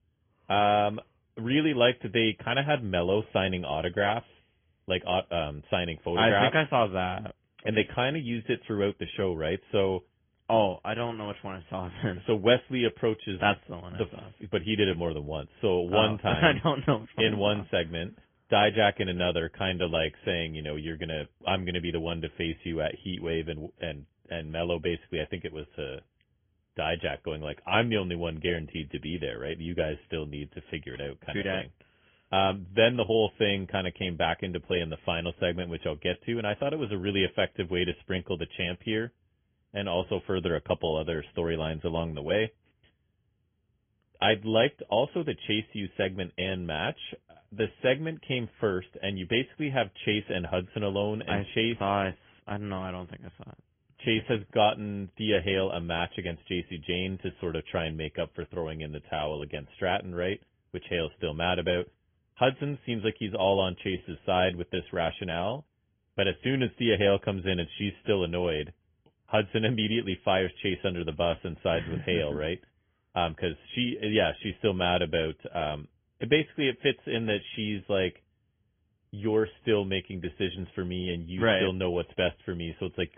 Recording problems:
high frequencies cut off; severe; nothing above 3.5 kHz
garbled, watery; slightly

